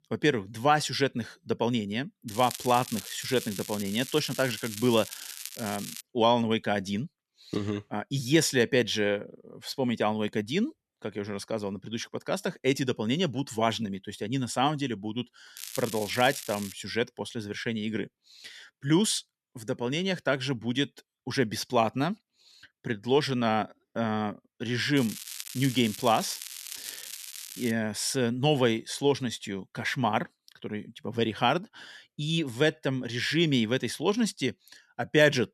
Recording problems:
crackling; noticeable; from 2.5 to 6 s, from 16 to 17 s and from 25 to 28 s; 10 dB below the speech

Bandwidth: 13.5 kHz